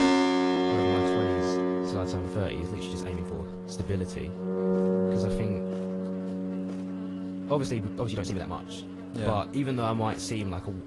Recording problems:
garbled, watery; slightly; nothing above 11 kHz
background music; very loud; throughout; 3 dB above the speech
electrical hum; noticeable; throughout; 50 Hz, 15 dB below the speech
chatter from many people; faint; throughout; 20 dB below the speech
uneven, jittery; strongly; from 0.5 to 8.5 s

